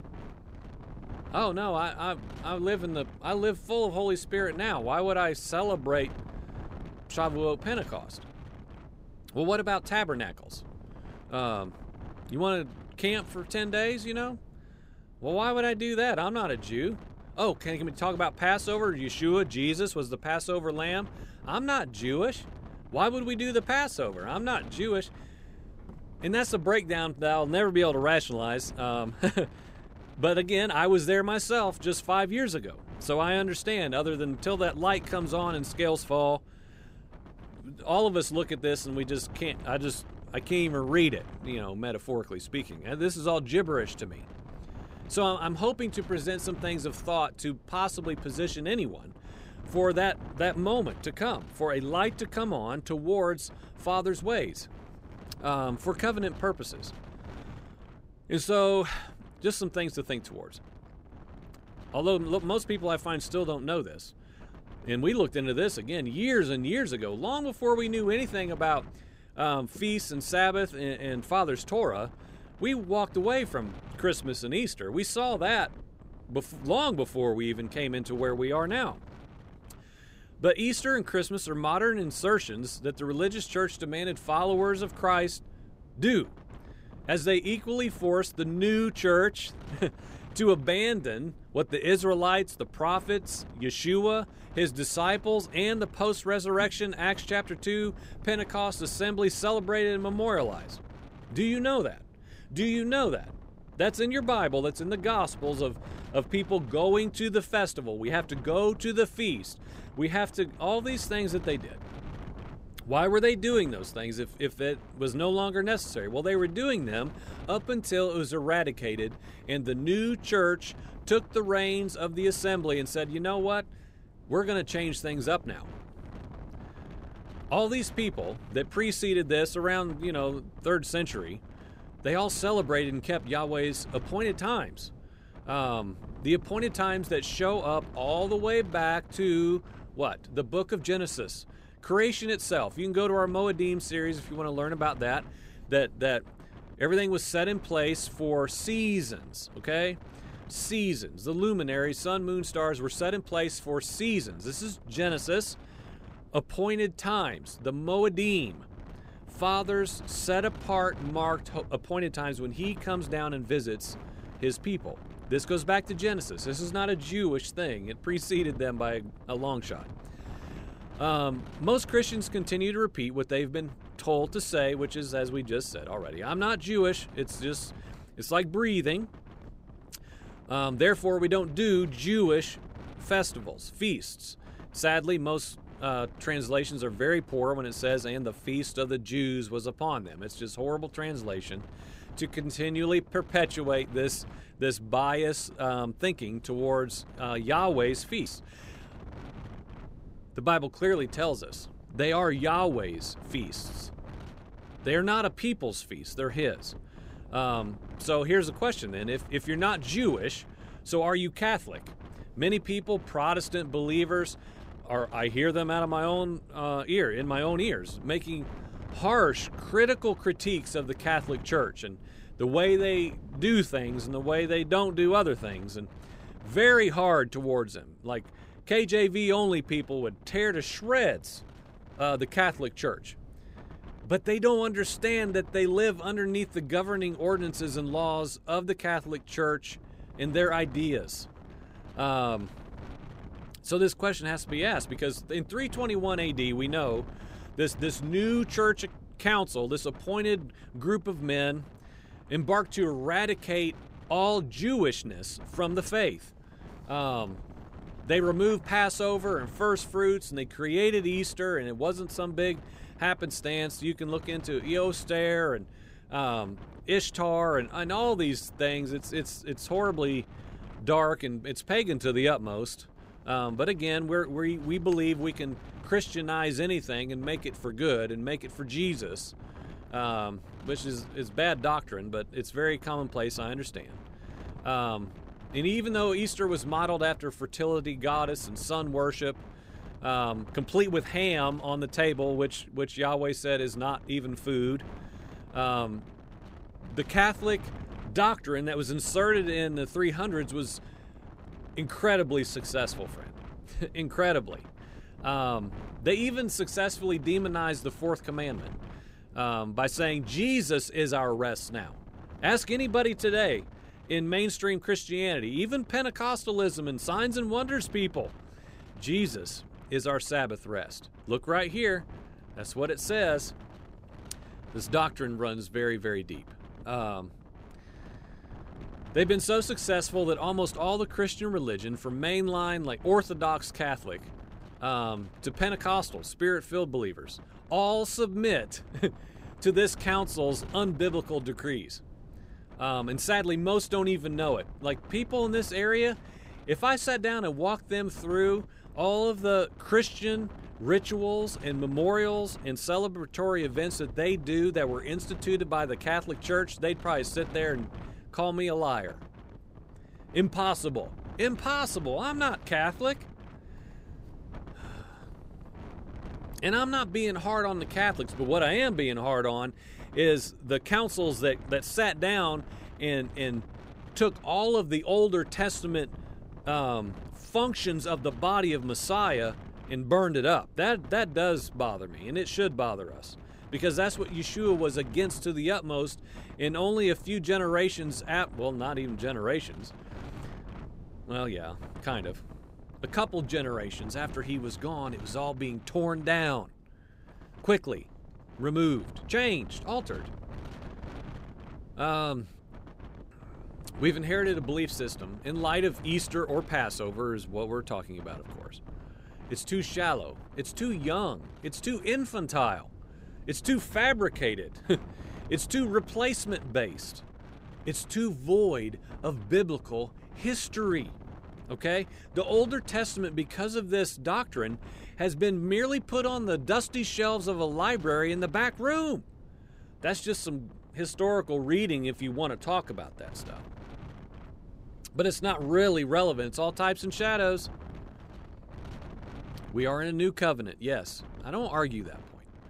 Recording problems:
wind noise on the microphone; occasional gusts; 25 dB below the speech

